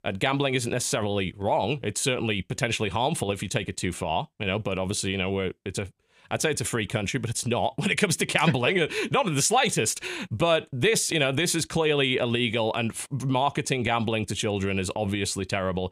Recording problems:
none

